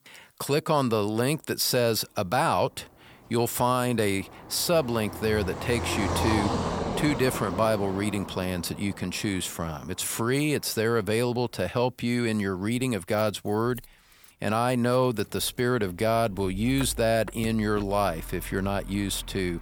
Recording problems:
traffic noise; loud; throughout; 9 dB below the speech

